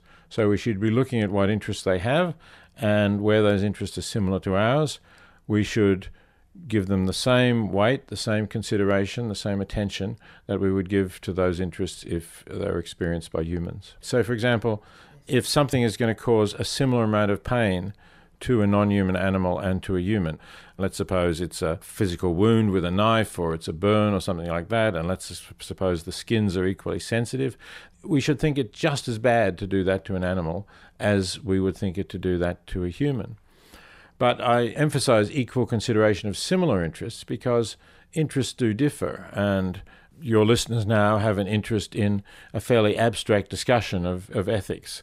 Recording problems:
none

